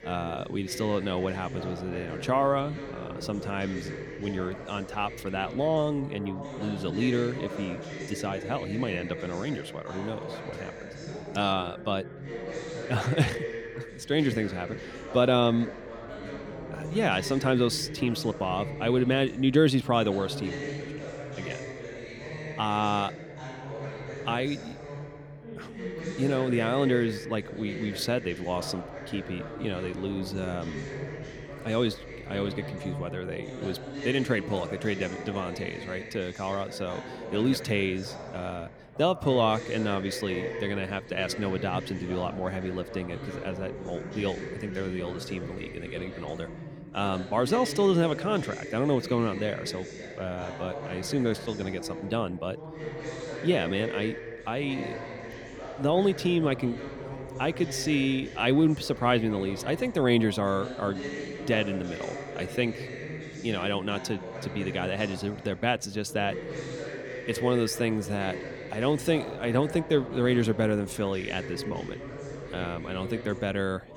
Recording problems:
background chatter; loud; throughout; 4 voices, 9 dB below the speech

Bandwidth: 18 kHz